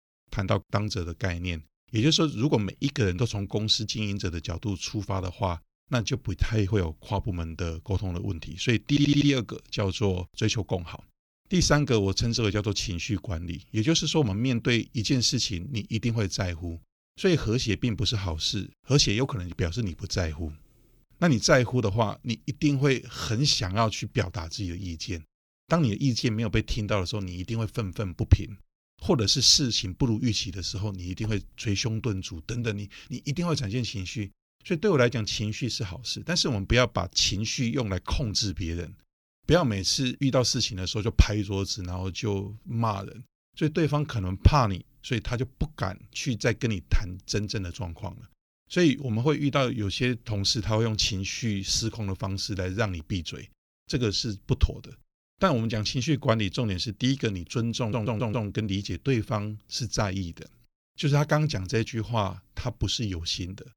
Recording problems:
audio stuttering; at 9 s and at 58 s

